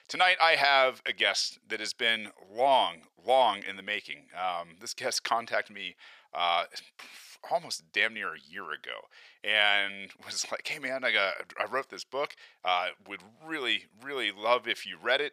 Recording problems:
thin; very; fading below 700 Hz

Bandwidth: 15 kHz